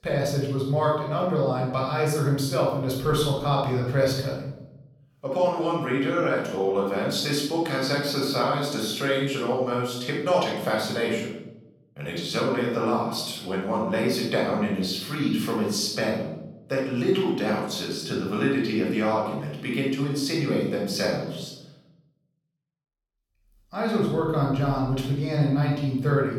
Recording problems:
off-mic speech; far
room echo; noticeable; dies away in 0.8 s

